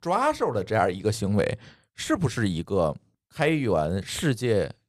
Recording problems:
none

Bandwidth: 15 kHz